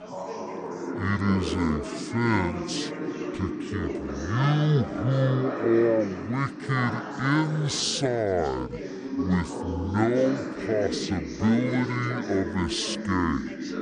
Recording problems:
wrong speed and pitch; too slow and too low; 0.5 times normal speed
background chatter; loud; throughout; 4 voices, 6 dB below the speech

